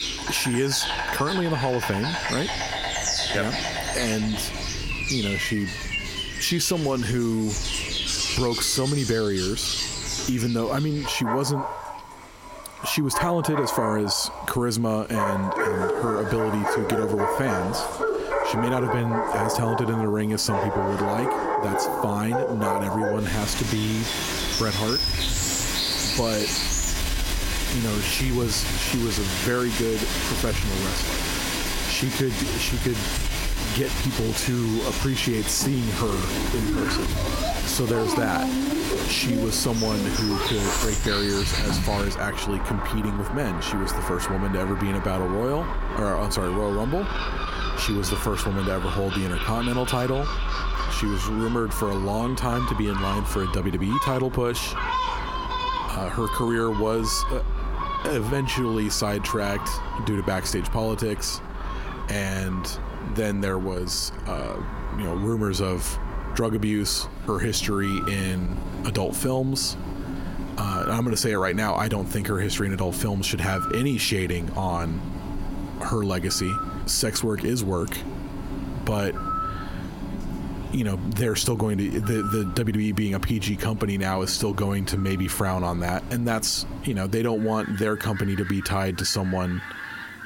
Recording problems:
squashed, flat; somewhat
animal sounds; loud; throughout; 3 dB below the speech

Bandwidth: 16.5 kHz